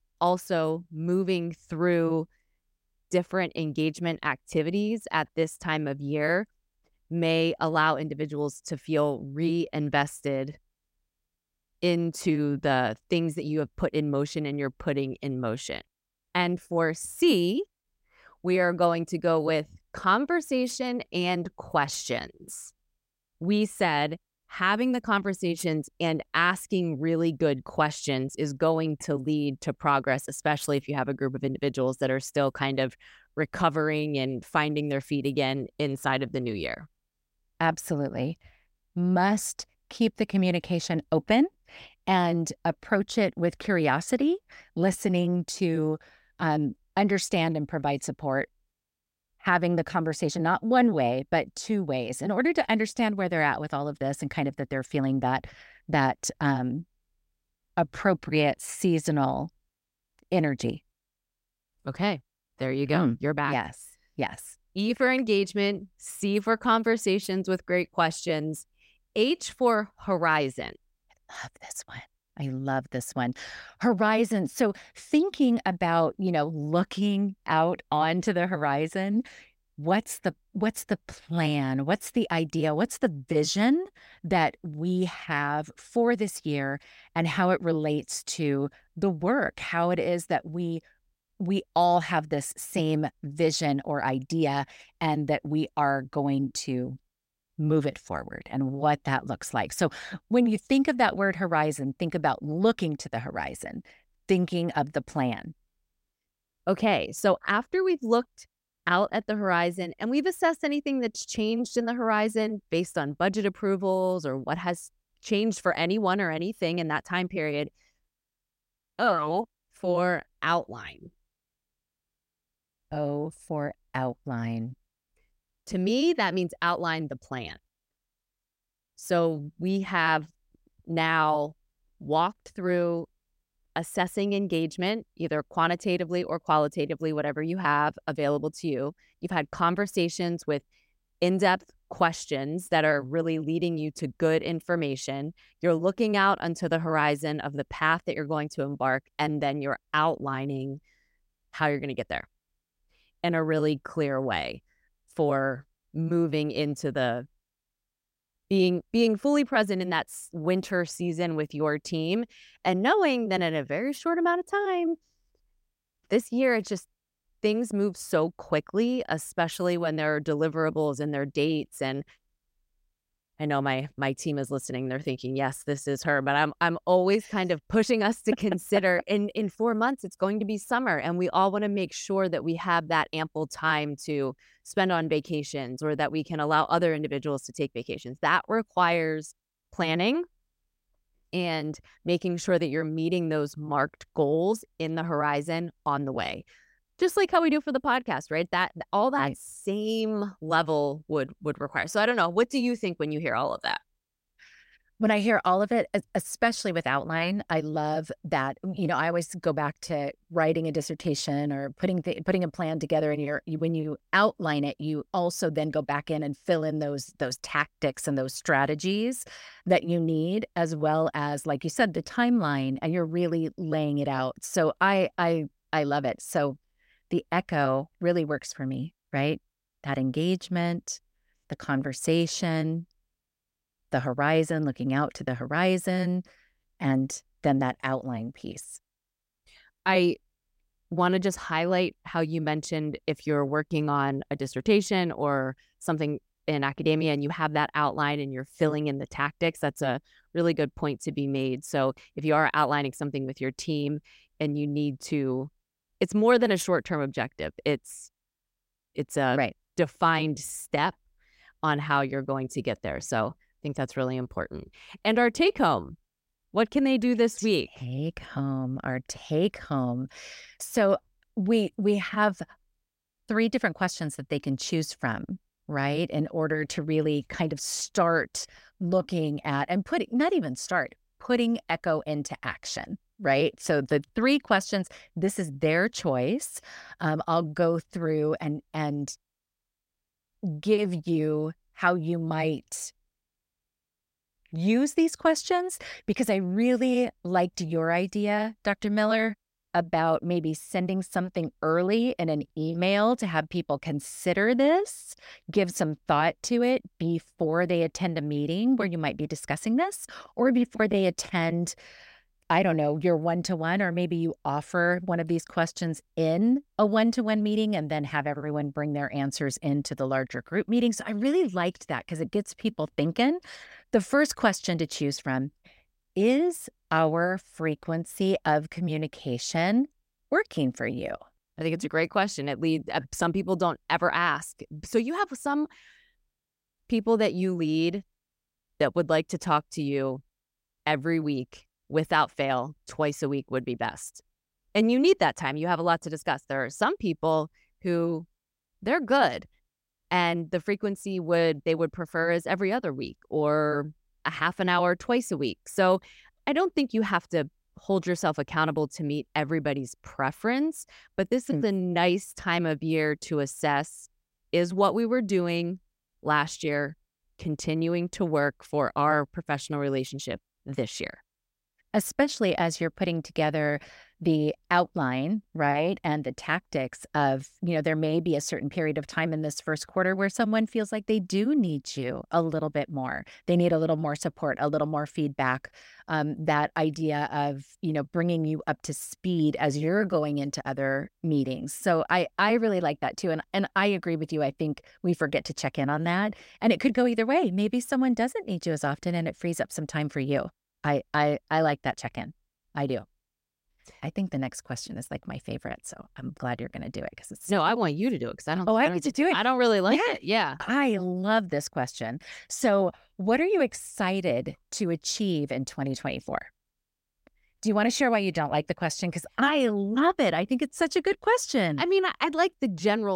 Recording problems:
abrupt cut into speech; at the end

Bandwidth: 16 kHz